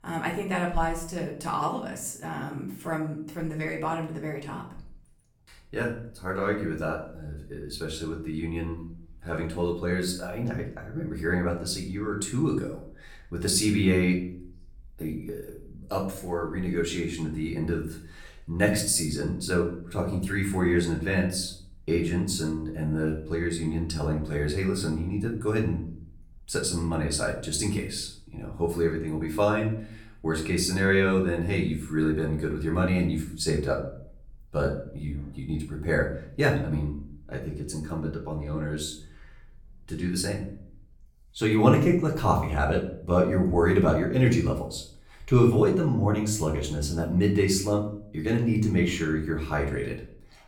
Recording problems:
off-mic speech; far
room echo; slight; dies away in 0.5 s

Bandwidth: 18.5 kHz